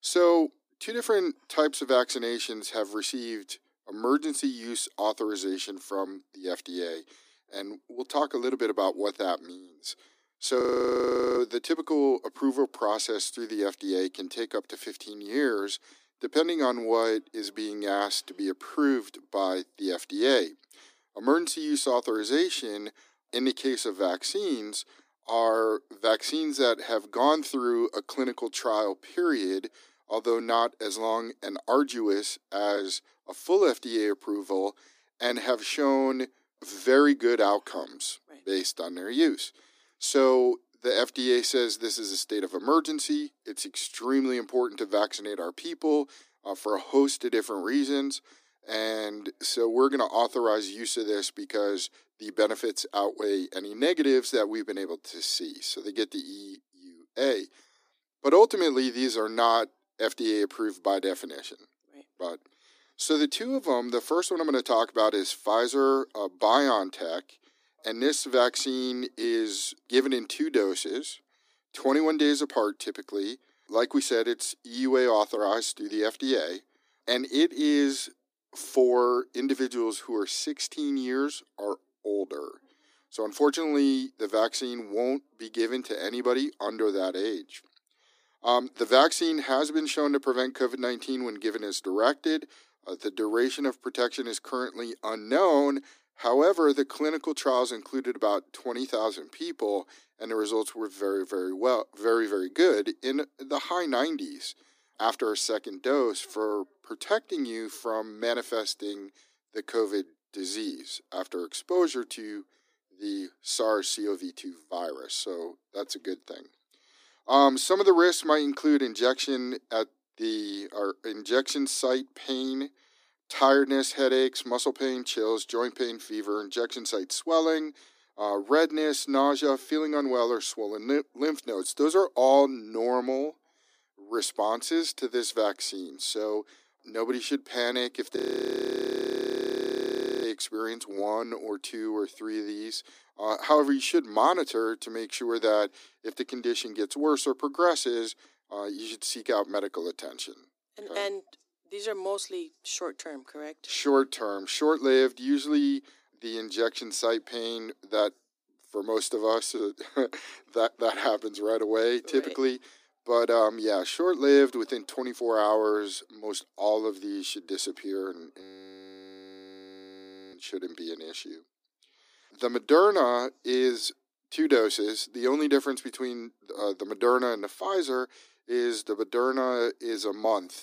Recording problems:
thin; somewhat; fading below 250 Hz
audio freezing; at 11 s for 1 s, at 2:18 for 2 s and at 2:48 for 2 s

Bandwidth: 15 kHz